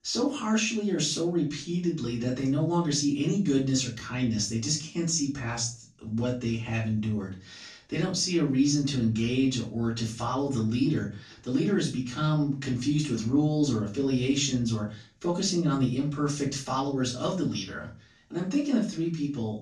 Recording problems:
off-mic speech; far
room echo; slight; dies away in 0.3 s

